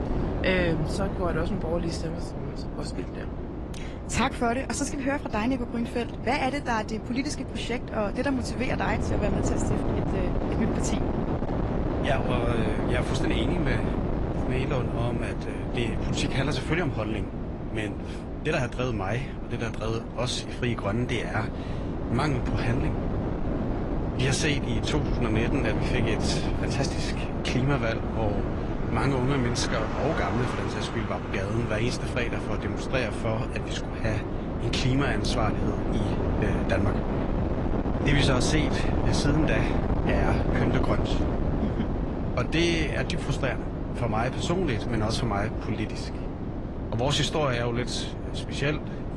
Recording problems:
garbled, watery; slightly
wind noise on the microphone; heavy; 4 dB below the speech
traffic noise; noticeable; throughout; 15 dB below the speech

